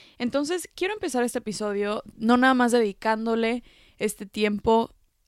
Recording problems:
none

